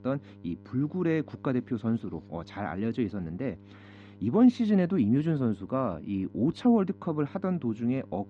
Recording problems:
muffled; slightly; fading above 4 kHz
electrical hum; faint; throughout; 50 Hz, 25 dB below the speech

